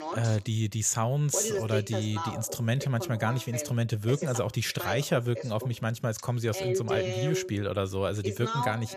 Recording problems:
voice in the background; loud; throughout; 6 dB below the speech

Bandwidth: 14.5 kHz